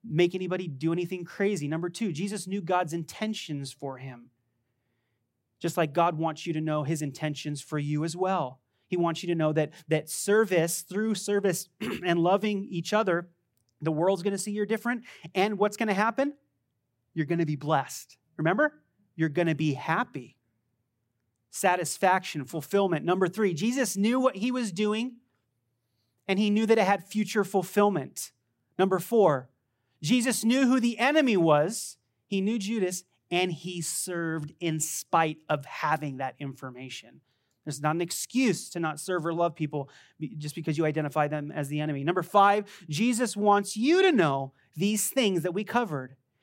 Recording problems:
none

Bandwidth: 16 kHz